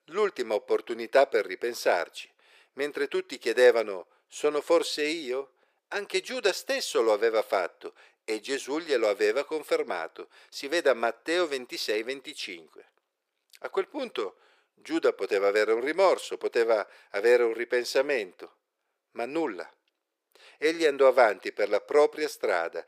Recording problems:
thin; very; fading below 400 Hz

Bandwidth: 15 kHz